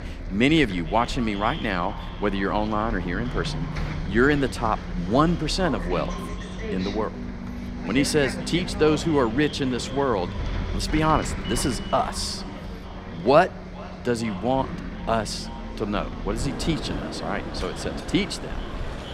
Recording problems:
echo of what is said; faint; throughout; 450 ms later, 20 dB below the speech
traffic noise; loud; throughout; 8 dB below the speech

